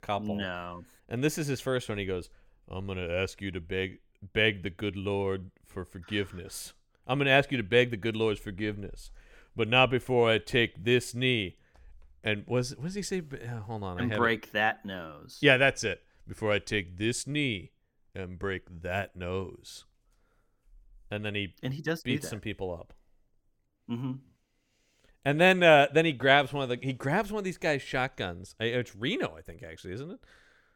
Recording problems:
none

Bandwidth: 17 kHz